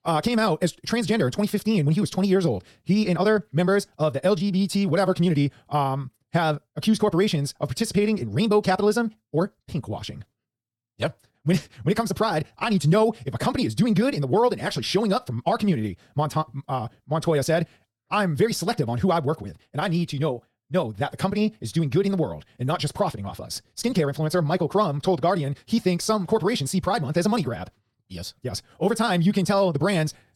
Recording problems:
wrong speed, natural pitch; too fast; 1.7 times normal speed

